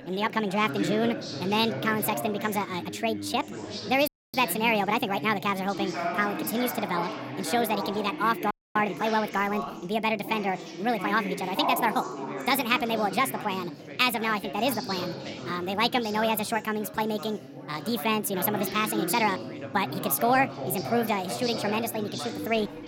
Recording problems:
wrong speed and pitch; too fast and too high; 1.5 times normal speed
background chatter; loud; throughout; 3 voices, 8 dB below the speech
audio cutting out; at 4 s and at 8.5 s

